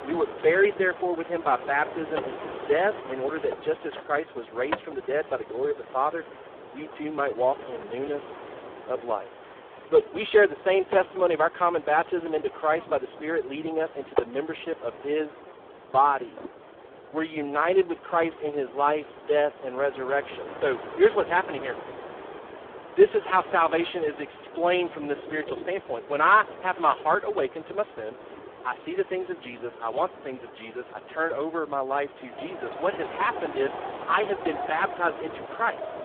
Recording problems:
phone-call audio; poor line
wind in the background; noticeable; throughout; 15 dB below the speech

